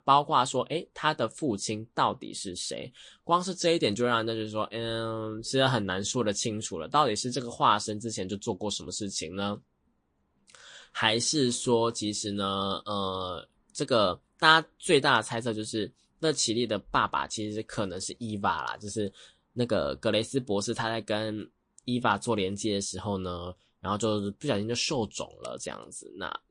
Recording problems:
garbled, watery; slightly; nothing above 9 kHz

